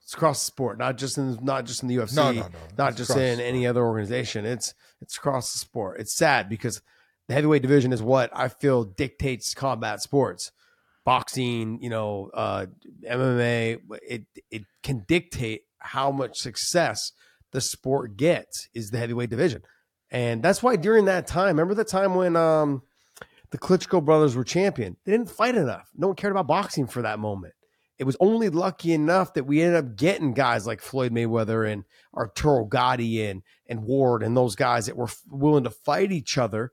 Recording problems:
uneven, jittery; strongly; from 2 to 36 s

